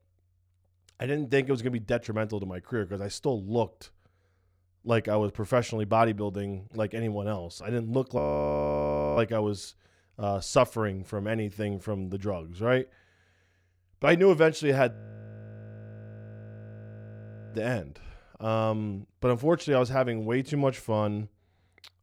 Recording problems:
audio freezing; at 8 s for 1 s and at 15 s for 2.5 s

